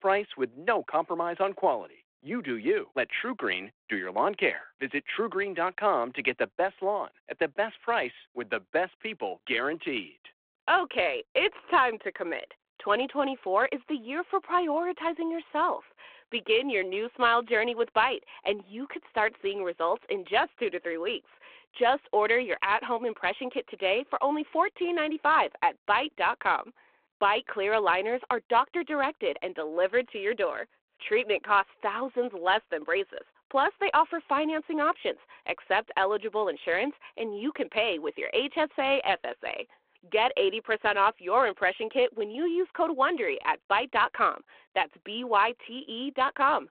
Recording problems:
phone-call audio

